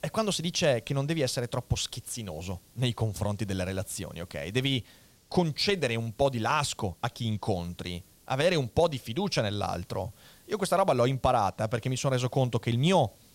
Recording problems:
hiss; faint; throughout; 30 dB below the speech

